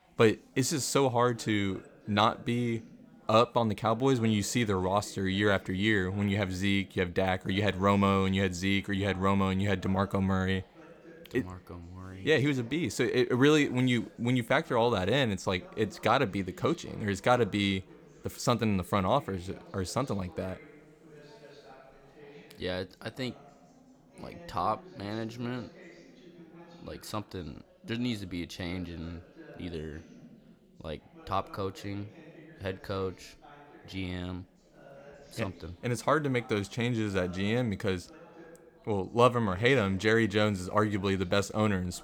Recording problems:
background chatter; faint; throughout; 3 voices, 25 dB below the speech

